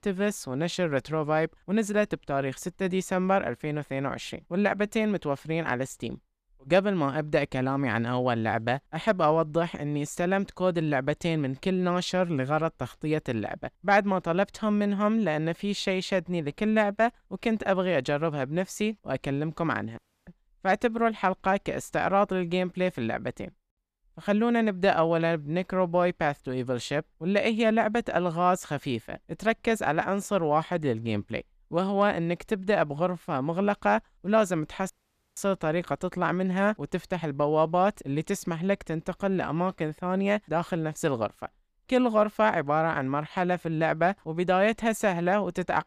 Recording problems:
audio cutting out; at 20 s and at 35 s

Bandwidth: 14.5 kHz